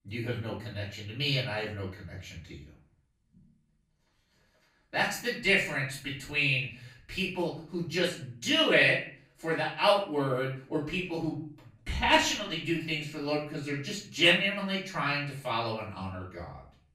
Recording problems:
off-mic speech; far
room echo; noticeable; dies away in 0.4 s

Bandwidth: 15.5 kHz